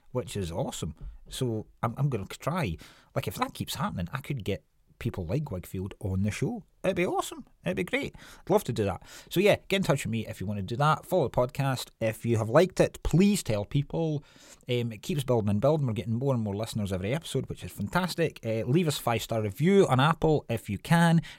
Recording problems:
none

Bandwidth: 16 kHz